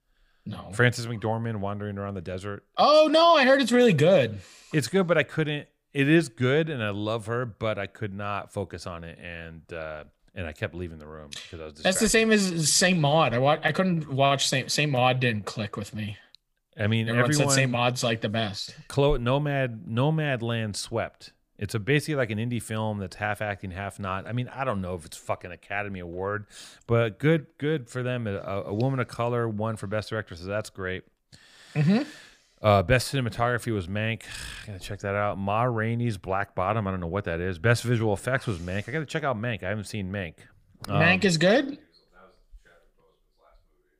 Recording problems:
none

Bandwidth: 15 kHz